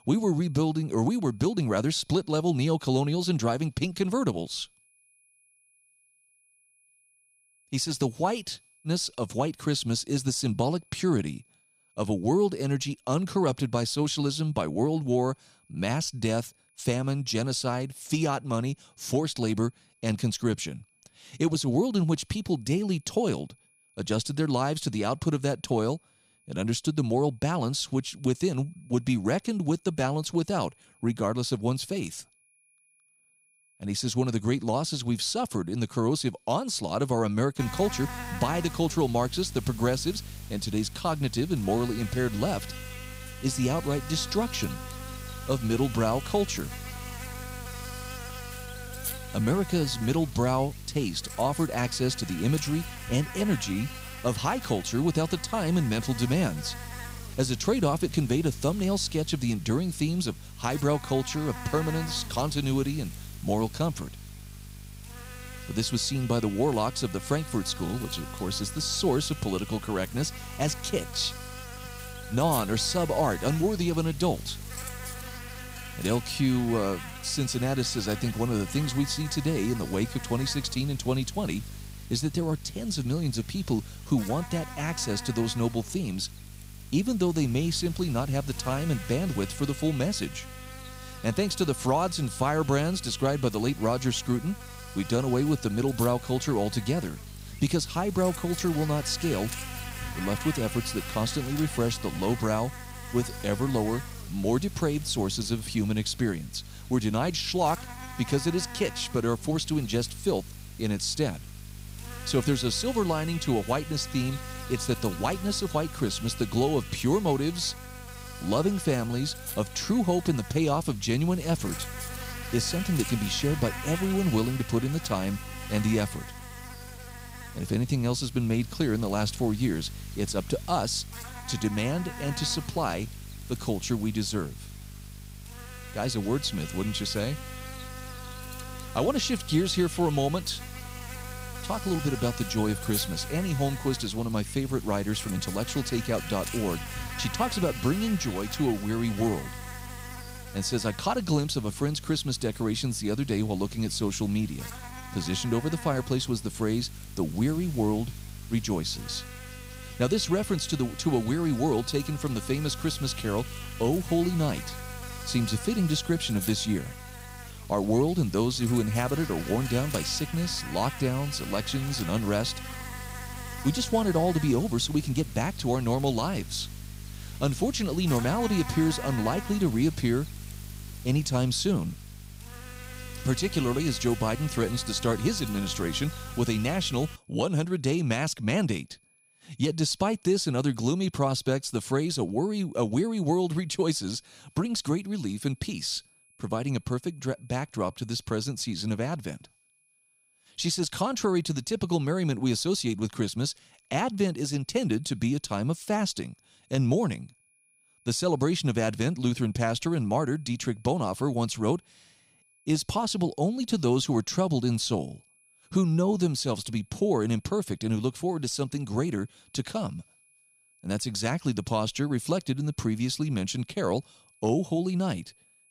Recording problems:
electrical hum; noticeable; from 38 s to 3:07; 50 Hz, 10 dB below the speech
high-pitched whine; faint; throughout; 2.5 kHz, 35 dB below the speech

